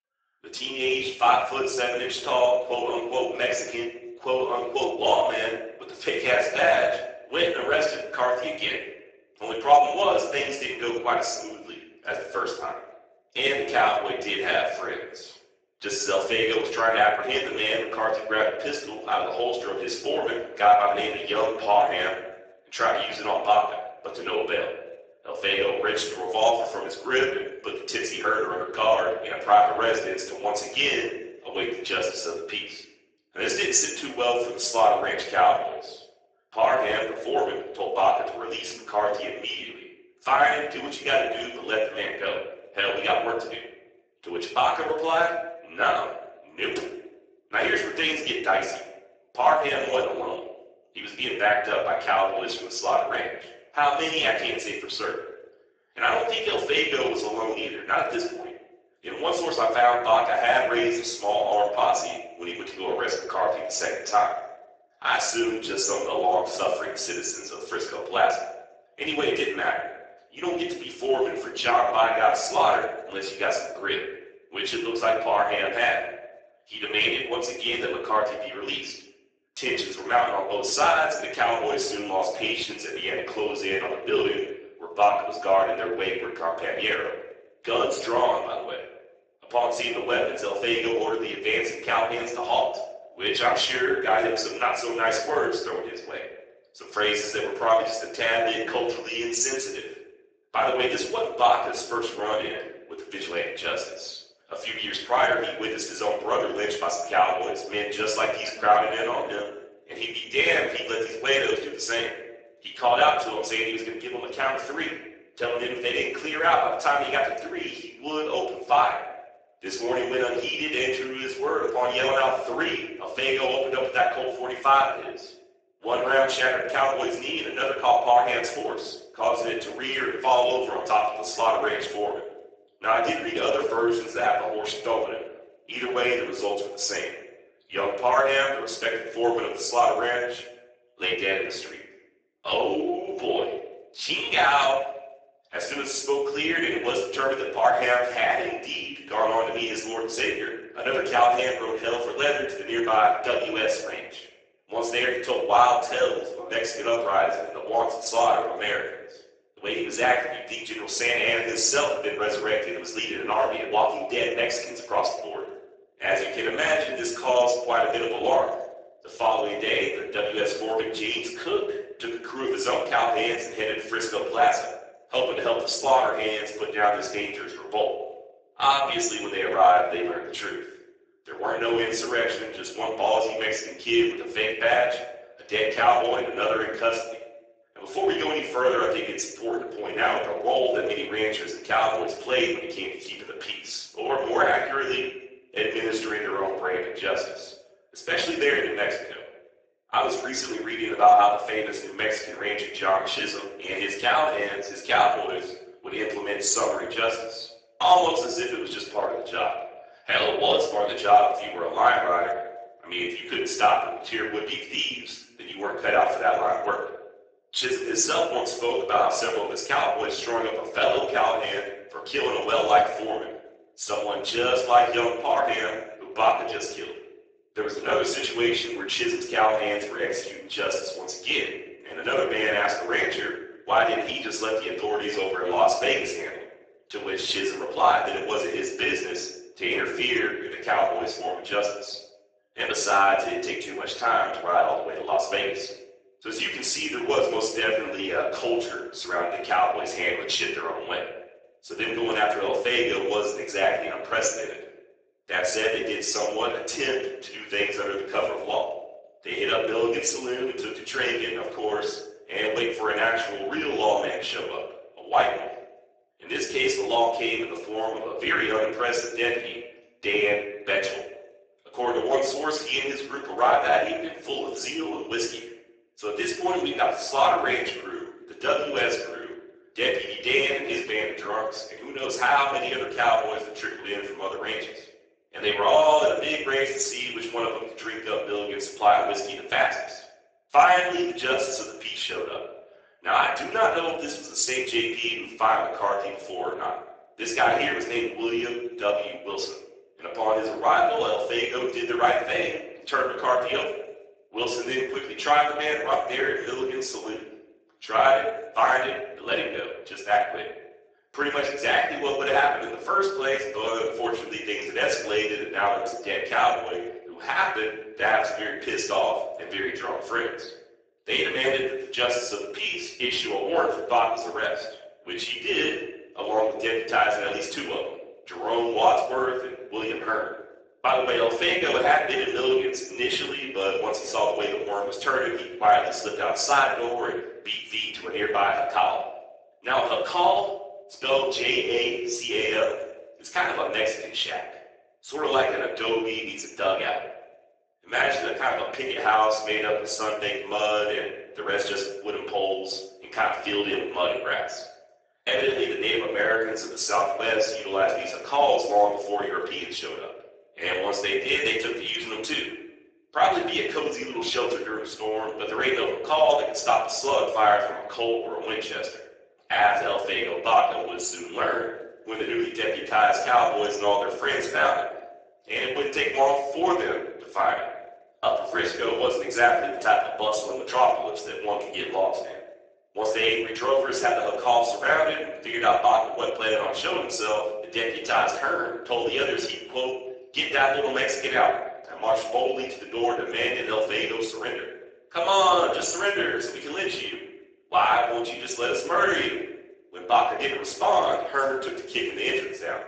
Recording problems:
off-mic speech; far
garbled, watery; badly; nothing above 7.5 kHz
thin; very; fading below 350 Hz
room echo; noticeable; dies away in 0.7 s

